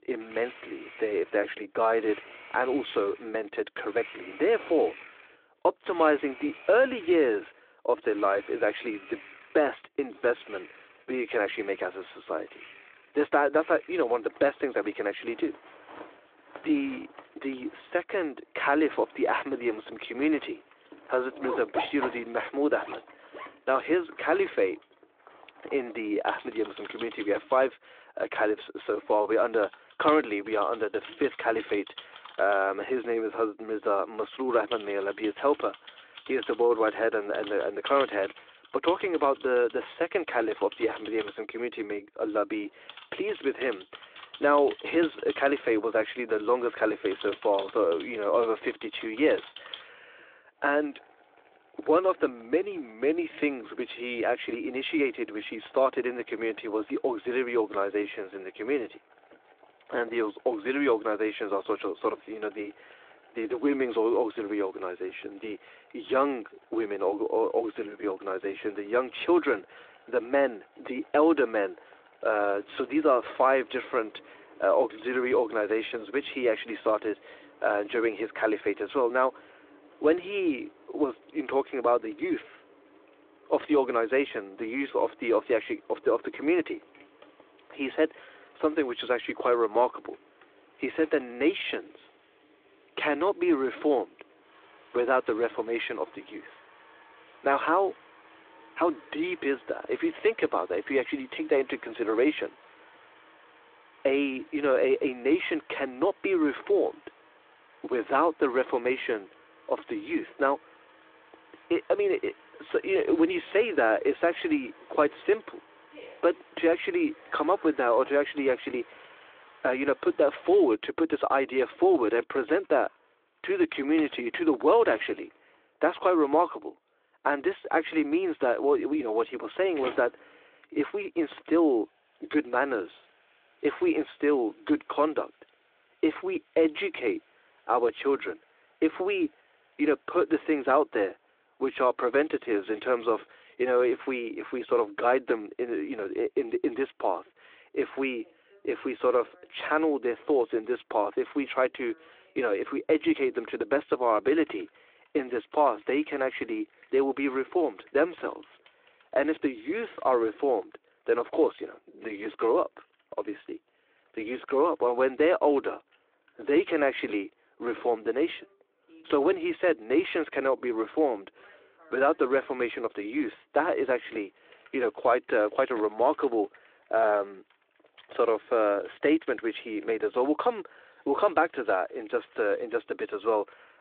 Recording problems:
phone-call audio
household noises; faint; throughout; 20 dB below the speech

